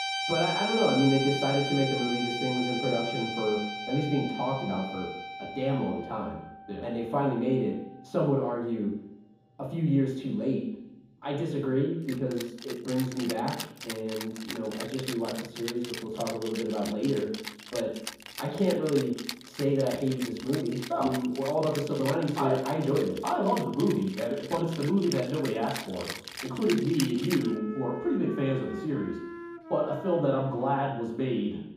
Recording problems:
off-mic speech; far
room echo; noticeable; dies away in 1.2 s
background music; loud; throughout; 7 dB below the speech

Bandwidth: 15.5 kHz